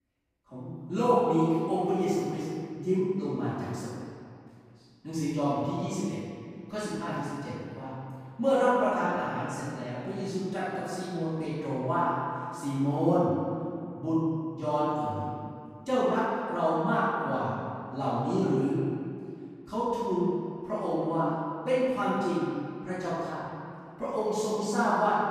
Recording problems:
room echo; strong; dies away in 2.2 s
off-mic speech; far

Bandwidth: 15 kHz